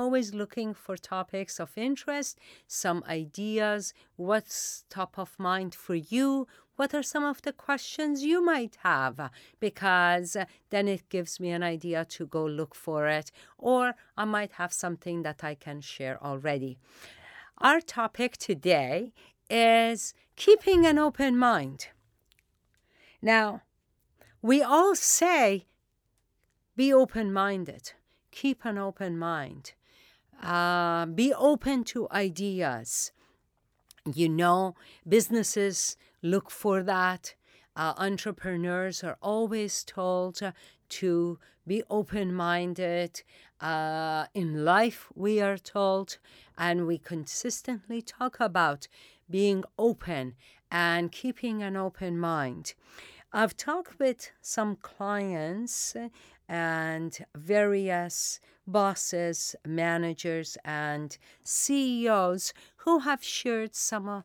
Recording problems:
abrupt cut into speech; at the start

